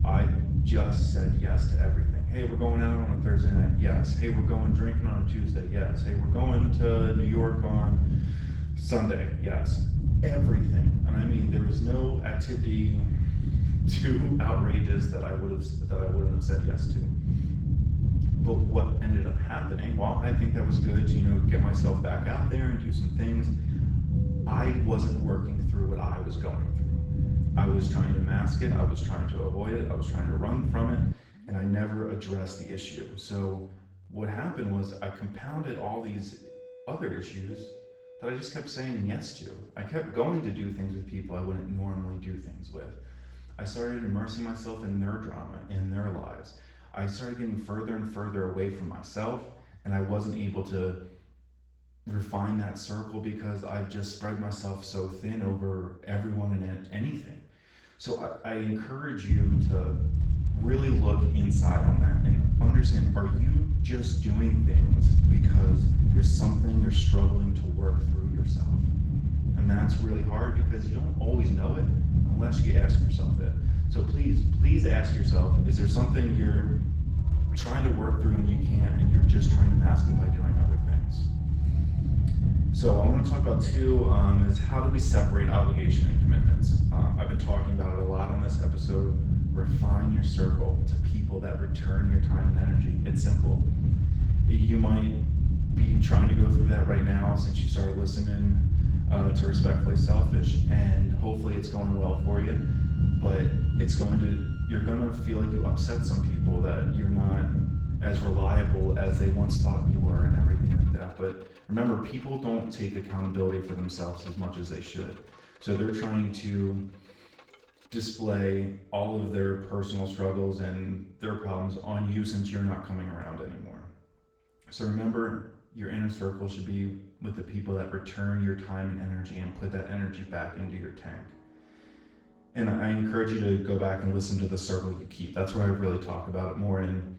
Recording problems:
off-mic speech; far
room echo; noticeable; dies away in 0.6 s
garbled, watery; slightly
low rumble; loud; until 31 s and from 59 s to 1:51; 3 dB below the speech
background music; faint; throughout; 20 dB below the speech

